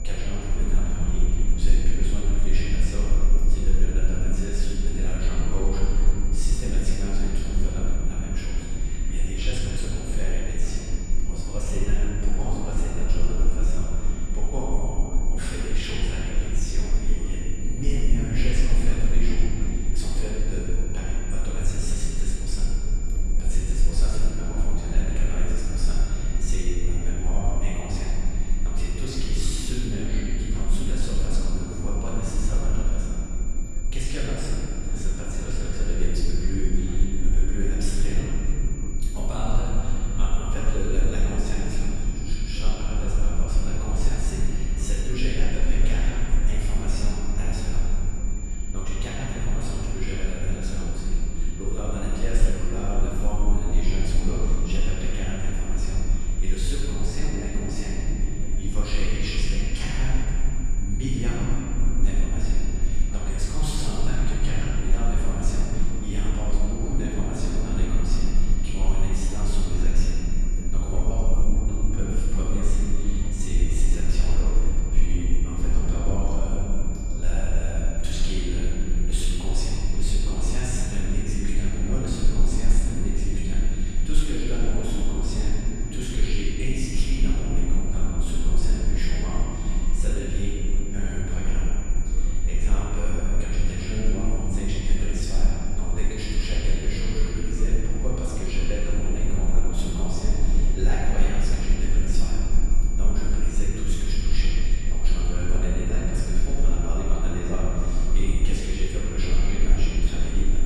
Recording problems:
room echo; strong; dies away in 3 s
off-mic speech; far
high-pitched whine; noticeable; throughout; 7 kHz, 10 dB below the speech
low rumble; noticeable; throughout; 10 dB below the speech
voice in the background; faint; throughout; 20 dB below the speech

